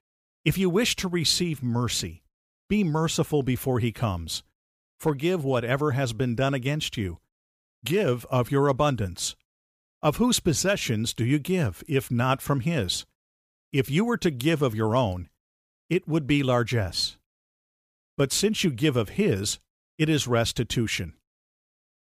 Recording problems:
none

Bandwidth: 15 kHz